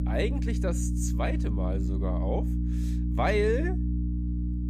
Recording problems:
electrical hum; loud; throughout; 60 Hz, 8 dB below the speech

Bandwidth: 14.5 kHz